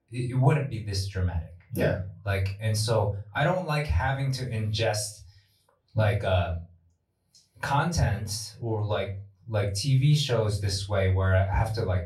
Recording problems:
off-mic speech; far
room echo; very slight; dies away in 0.3 s

